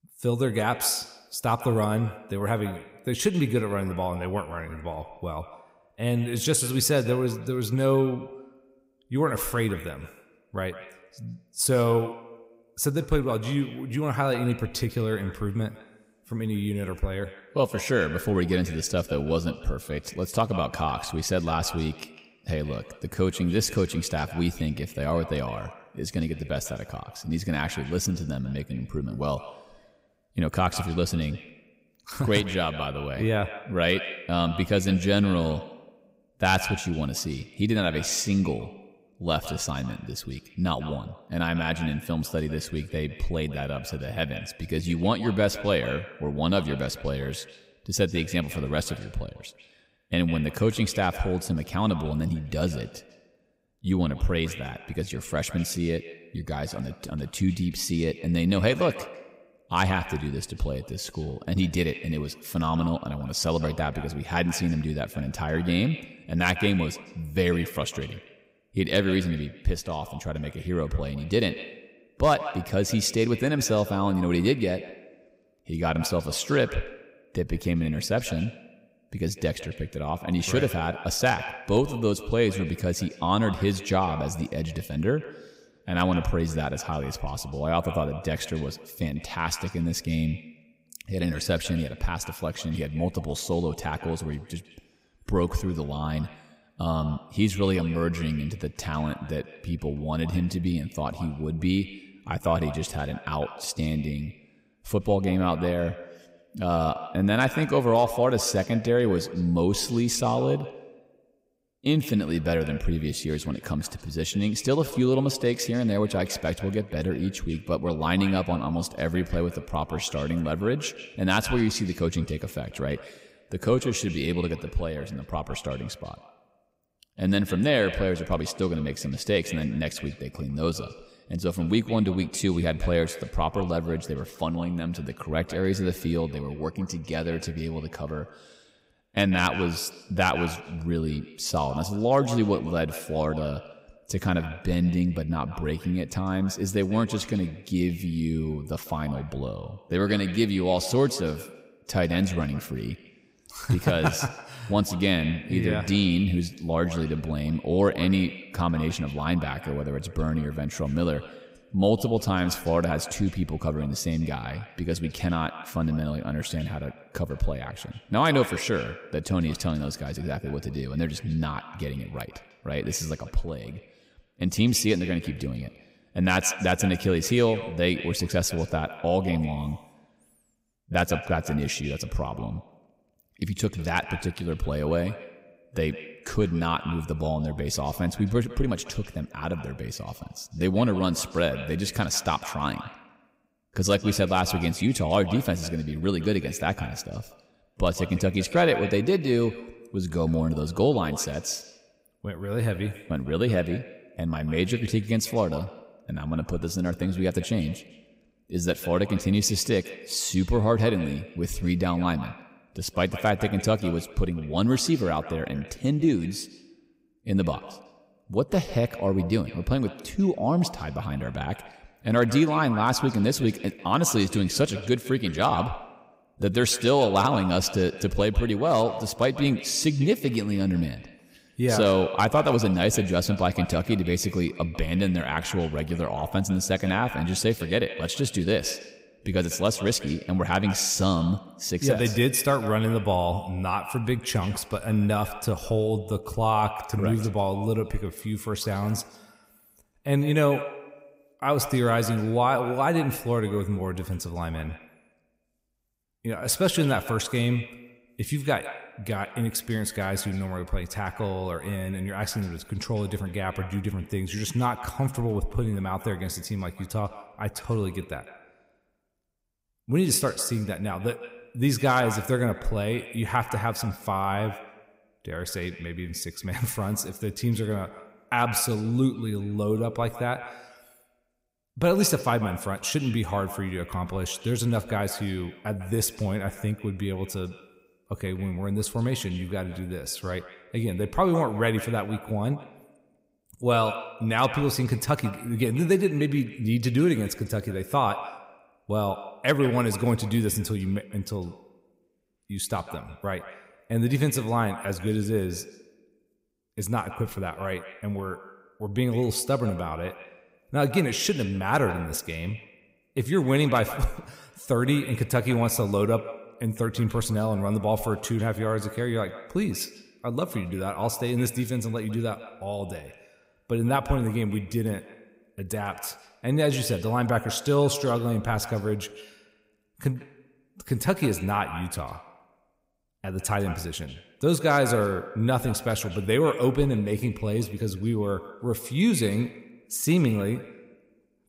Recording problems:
echo of what is said; noticeable; throughout; 150 ms later, 15 dB below the speech

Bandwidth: 15.5 kHz